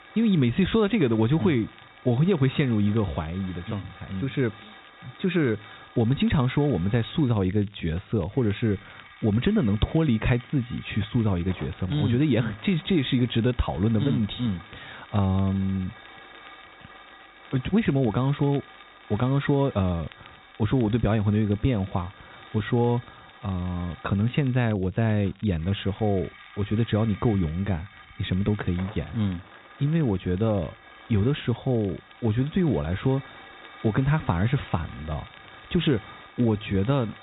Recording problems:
high frequencies cut off; severe; nothing above 4 kHz
hiss; faint; throughout; 20 dB below the speech
crackle, like an old record; faint; 30 dB below the speech

